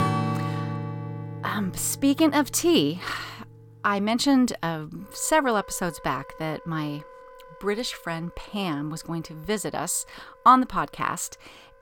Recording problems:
background music; noticeable; throughout; 10 dB below the speech

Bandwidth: 17 kHz